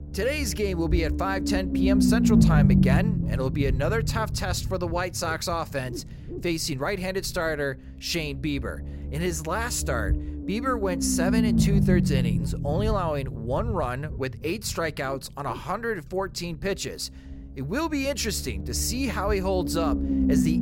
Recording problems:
low rumble; loud; throughout; 4 dB below the speech

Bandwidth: 16 kHz